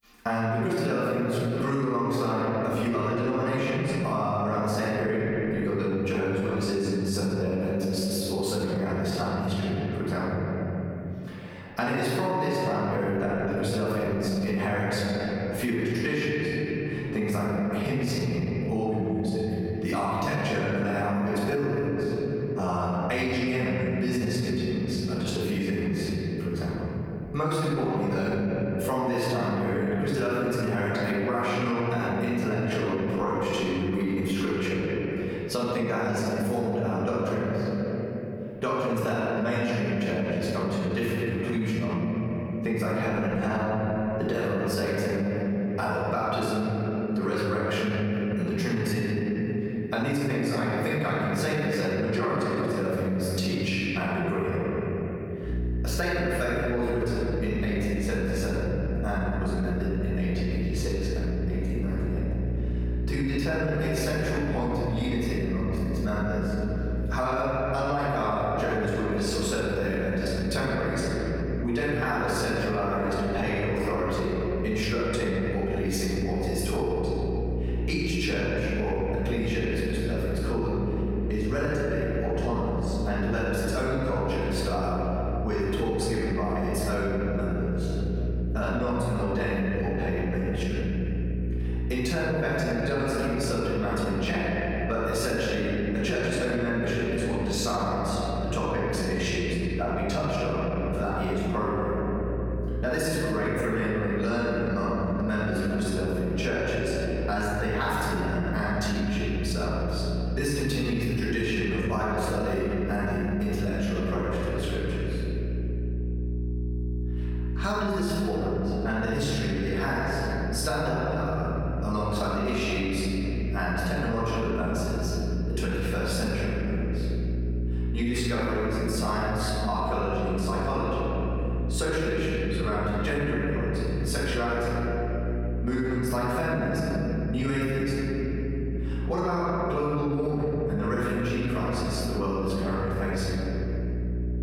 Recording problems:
room echo; strong; dies away in 2.7 s
off-mic speech; far
squashed, flat; somewhat
electrical hum; noticeable; from 56 s on; 60 Hz, 15 dB below the speech

